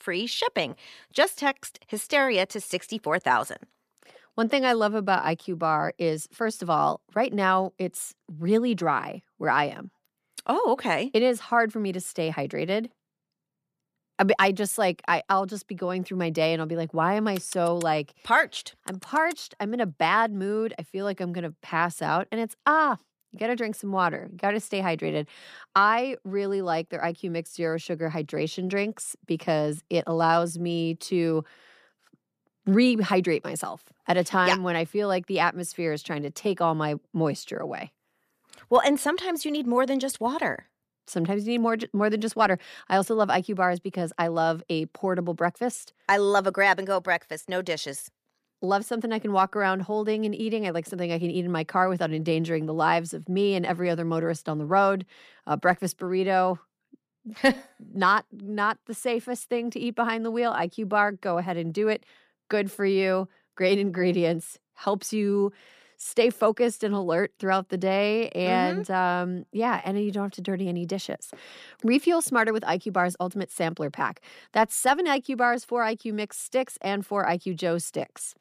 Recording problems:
none

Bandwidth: 14.5 kHz